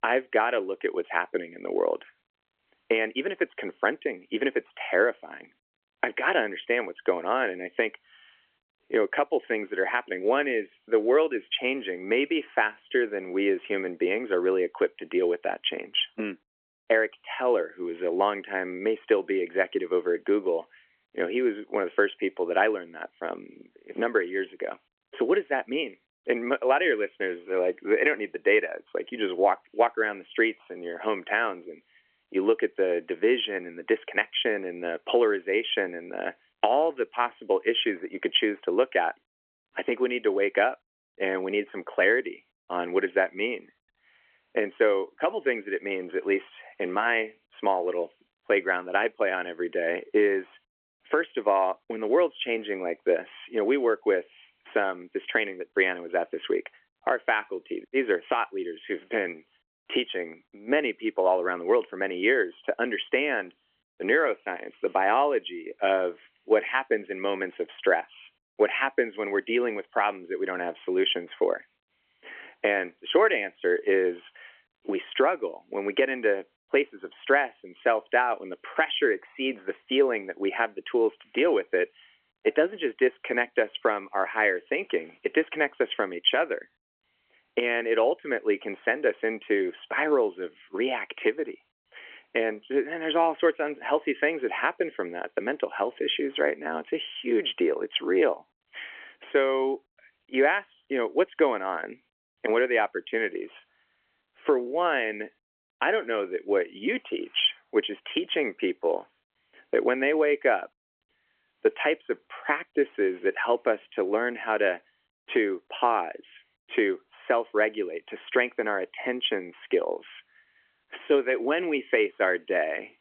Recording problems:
phone-call audio; nothing above 3.5 kHz

